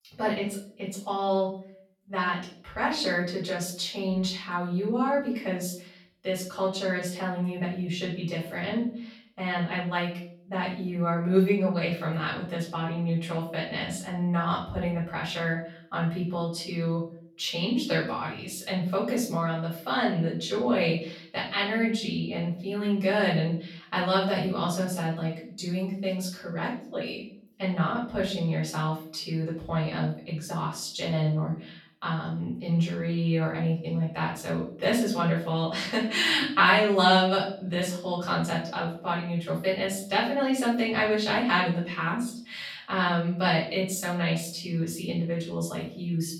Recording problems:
off-mic speech; far
room echo; noticeable; dies away in 0.5 s

